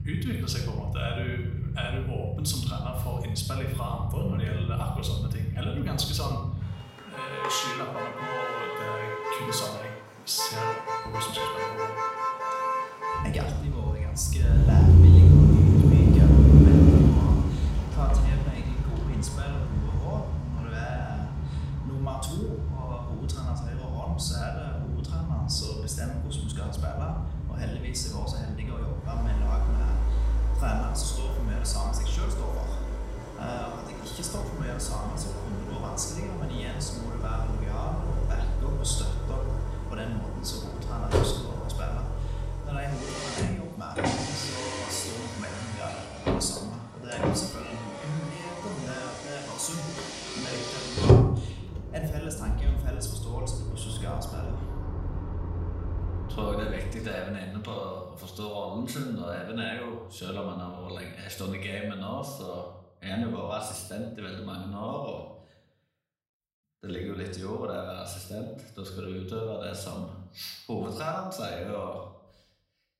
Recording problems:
off-mic speech; far
room echo; noticeable; dies away in 0.6 s
traffic noise; very loud; until 57 s; 10 dB above the speech

